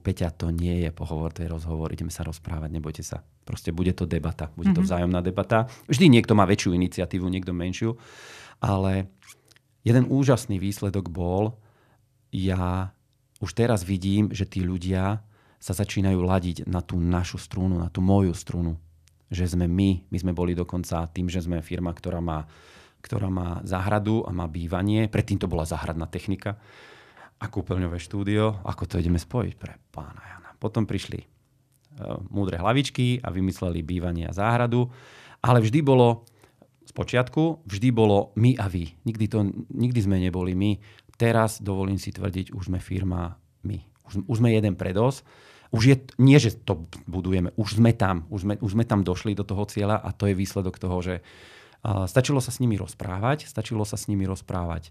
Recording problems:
none

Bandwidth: 14.5 kHz